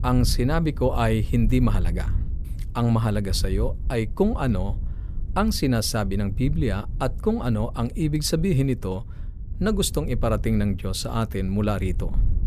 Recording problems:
wind noise on the microphone; occasional gusts; 20 dB below the speech

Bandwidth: 14.5 kHz